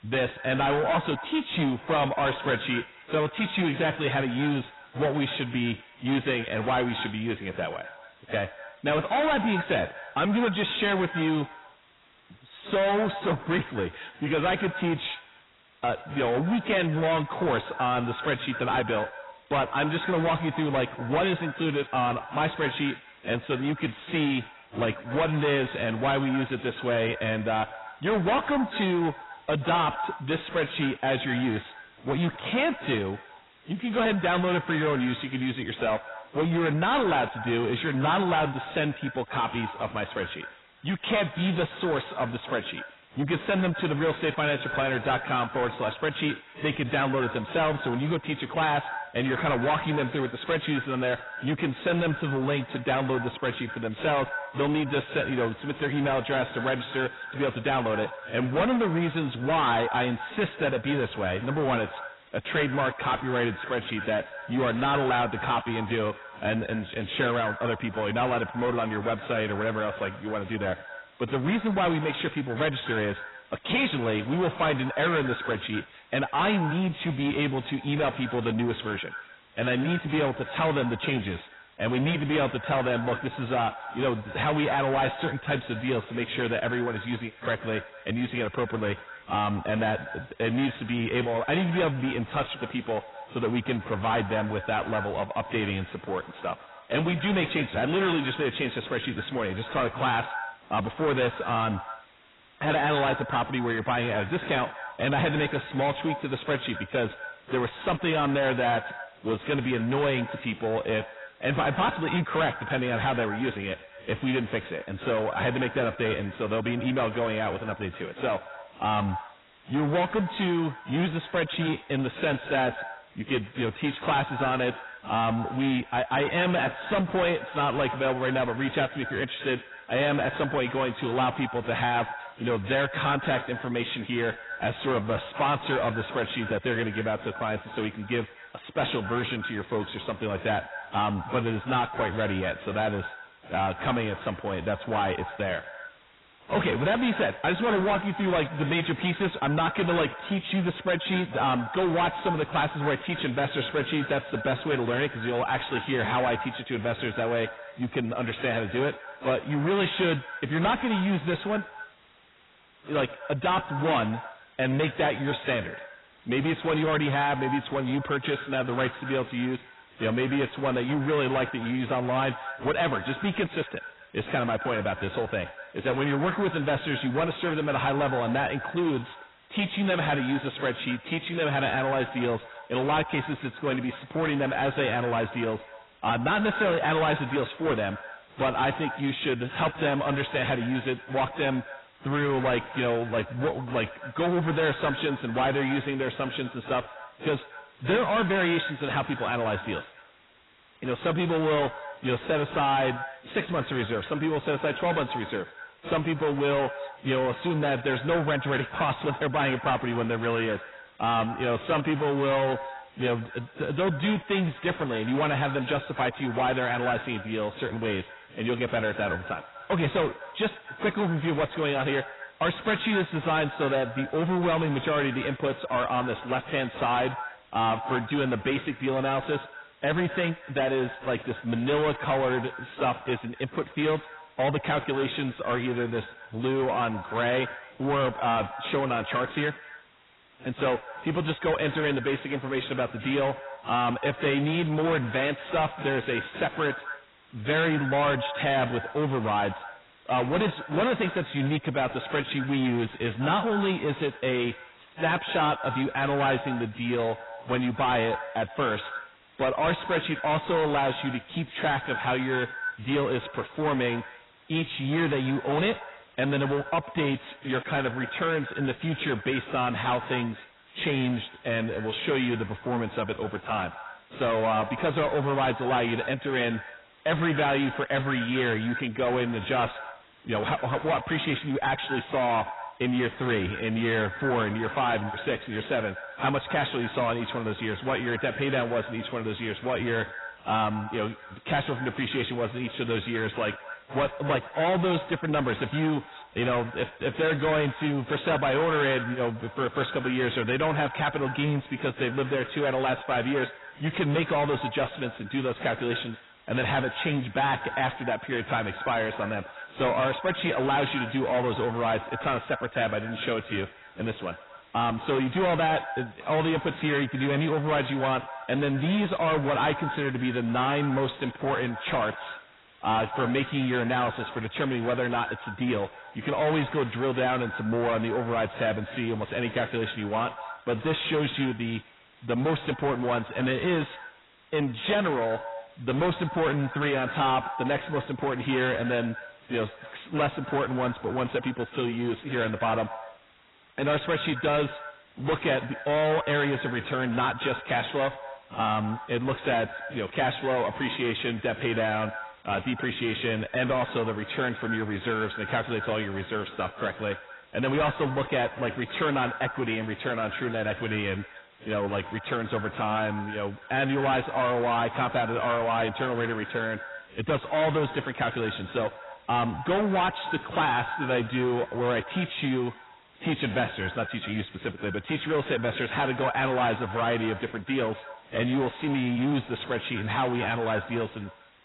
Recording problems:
distortion; heavy; 6 dB below the speech
garbled, watery; badly; nothing above 4 kHz
echo of what is said; noticeable; throughout; 120 ms later, 15 dB below the speech
hiss; faint; throughout; 30 dB below the speech

